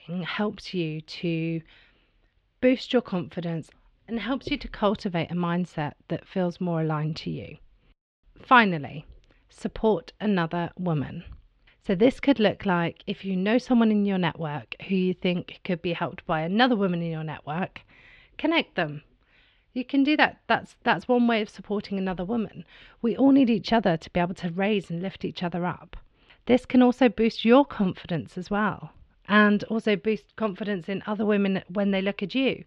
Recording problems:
muffled; slightly; fading above 3.5 kHz

